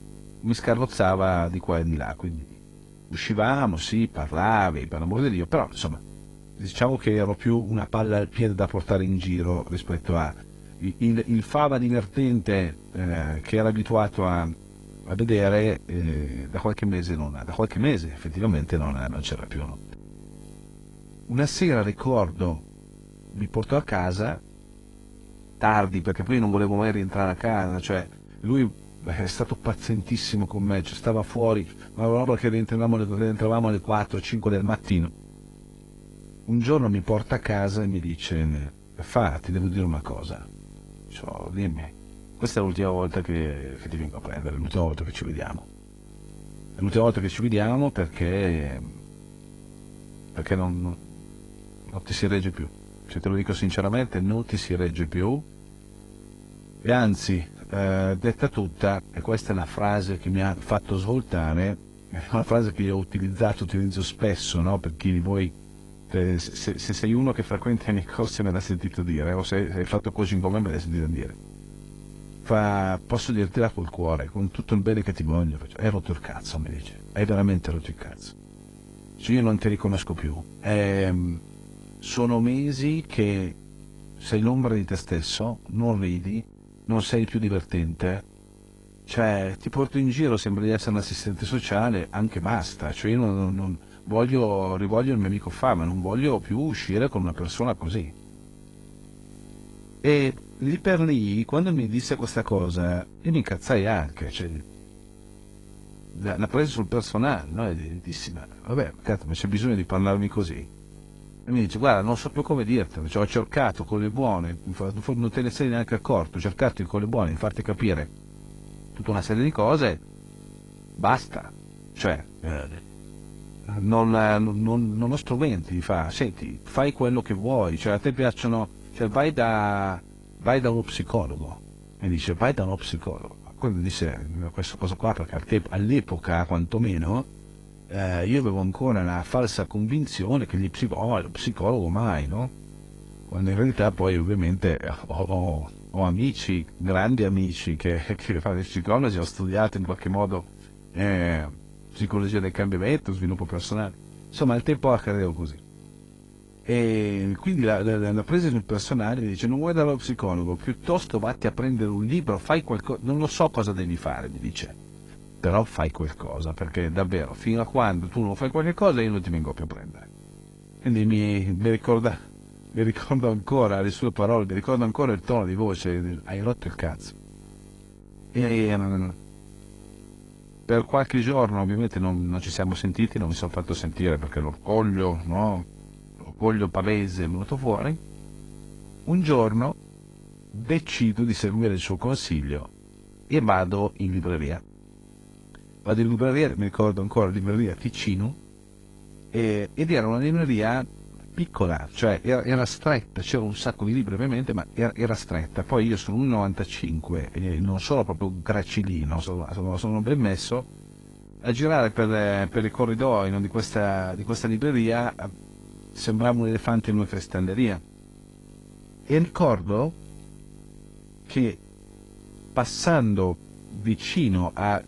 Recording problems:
garbled, watery; slightly; nothing above 10.5 kHz
electrical hum; faint; throughout; 50 Hz, 25 dB below the speech

